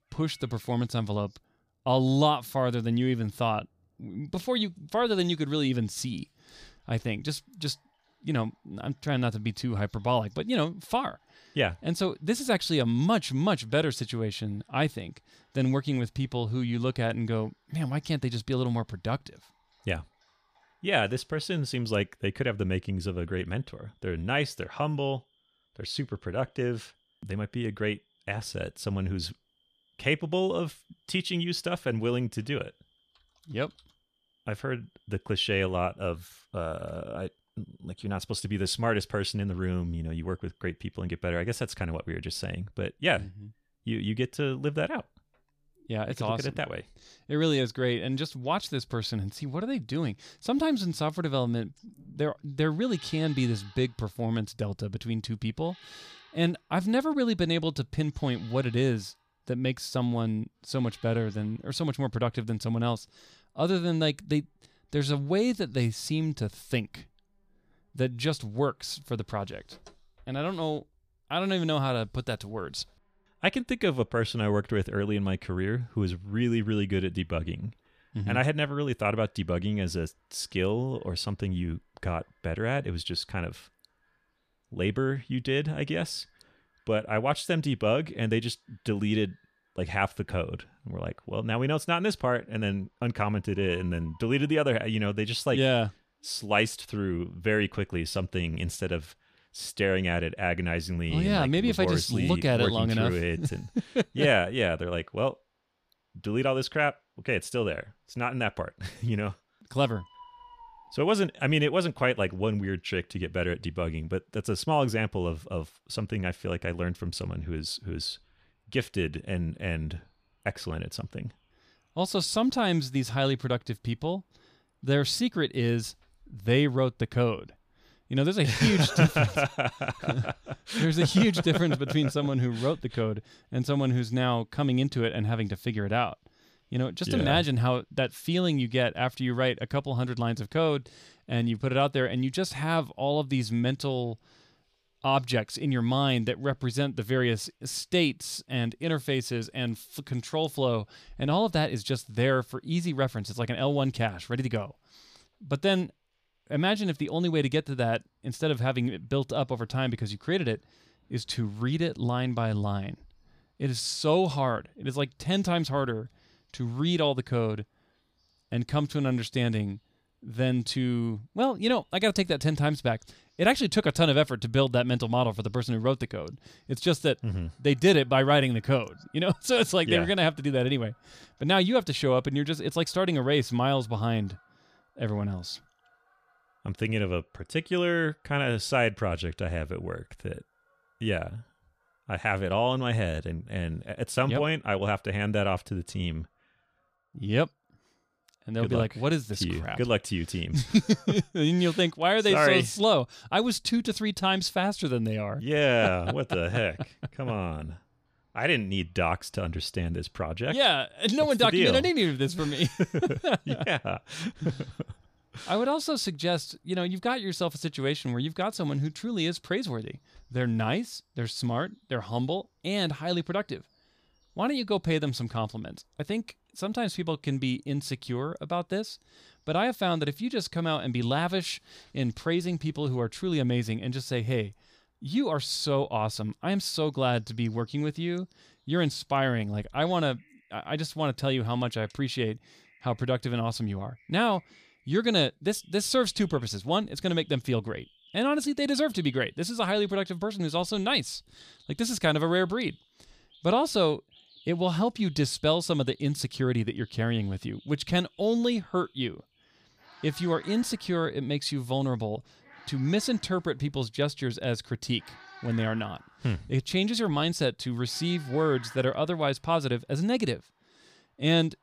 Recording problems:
animal sounds; faint; throughout; 30 dB below the speech

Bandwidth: 14.5 kHz